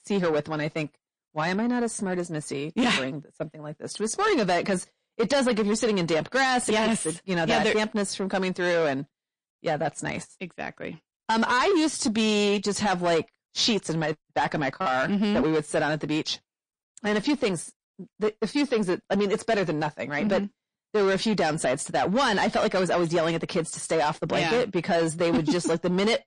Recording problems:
distortion; slight; 10 dB below the speech
garbled, watery; slightly; nothing above 8.5 kHz

